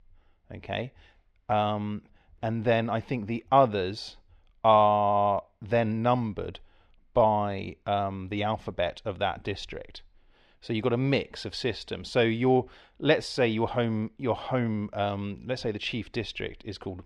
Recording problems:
muffled; very slightly; fading above 3 kHz

